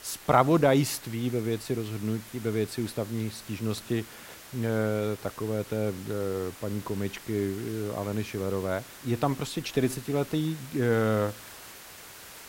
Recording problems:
hiss; noticeable; throughout; 15 dB below the speech

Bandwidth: 16 kHz